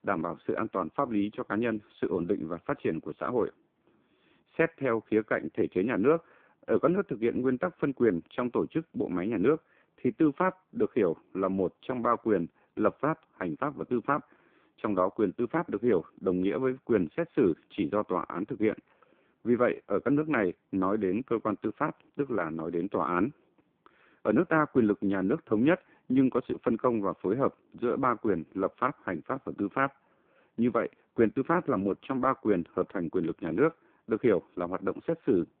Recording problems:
phone-call audio; poor line

